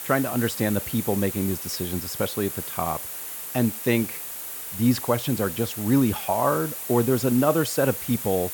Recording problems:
hiss; loud; throughout; 6 dB below the speech

